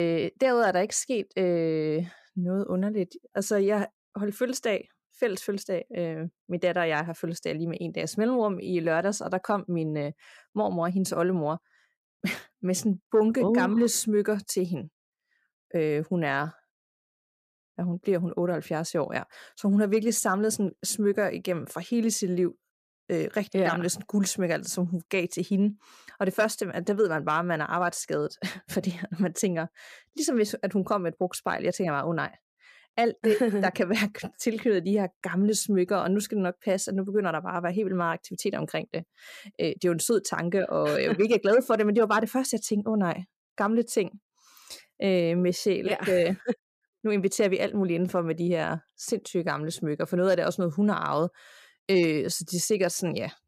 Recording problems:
abrupt cut into speech; at the start

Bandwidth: 14.5 kHz